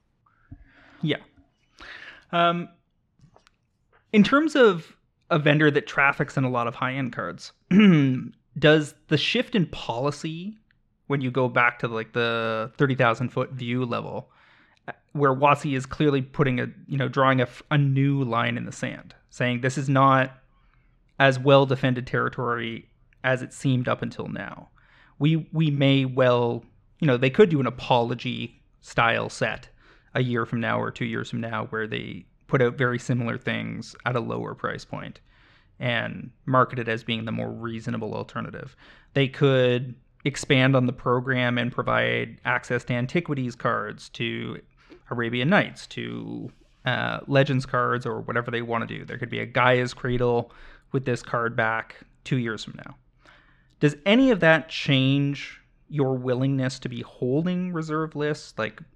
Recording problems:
muffled; slightly; fading above 3 kHz

